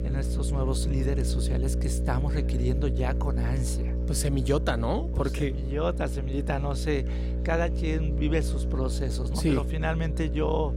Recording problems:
electrical hum; loud; throughout; 60 Hz, 9 dB below the speech
murmuring crowd; faint; throughout; 25 dB below the speech

